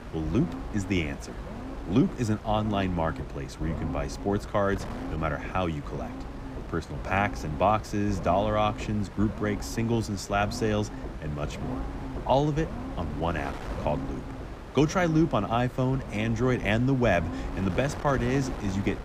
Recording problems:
wind noise on the microphone; occasional gusts; 15 dB below the speech
low rumble; noticeable; throughout; 15 dB below the speech

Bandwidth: 15 kHz